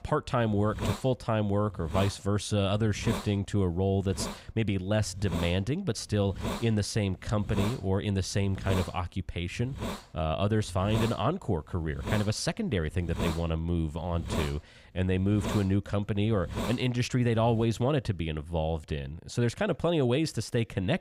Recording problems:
hiss; loud; until 18 s; 9 dB below the speech

